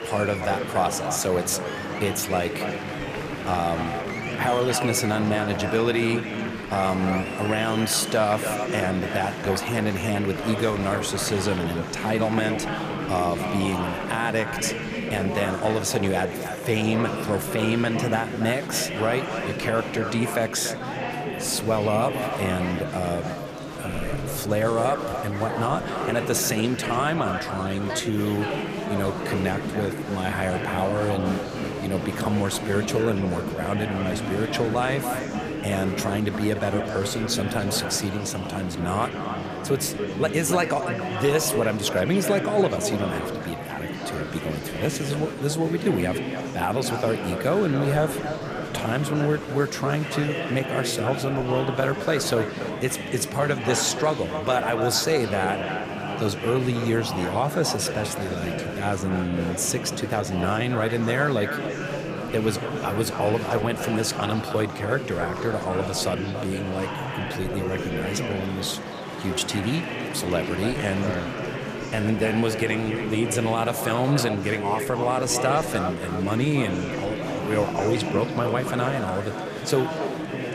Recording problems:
echo of what is said; strong; throughout; 290 ms later, 10 dB below the speech
murmuring crowd; loud; throughout; 5 dB below the speech

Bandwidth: 14.5 kHz